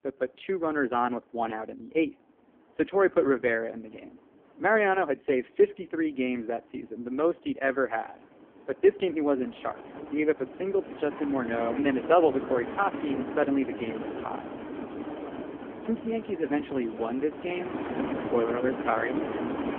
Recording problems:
phone-call audio; poor line
wind in the background; loud; throughout; 8 dB below the speech

